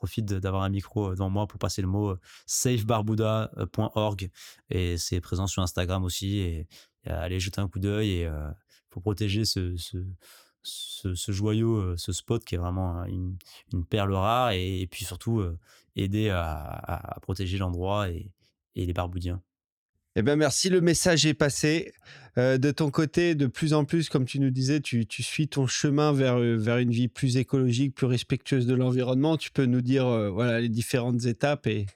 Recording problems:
none

